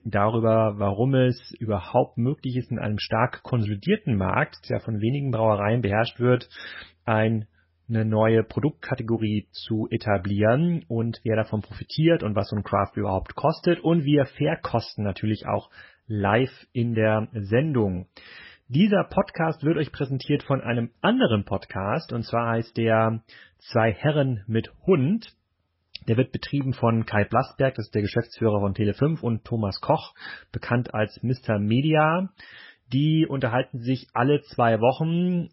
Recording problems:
garbled, watery; badly; nothing above 5.5 kHz

